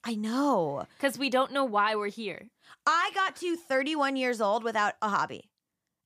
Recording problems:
none

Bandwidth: 15 kHz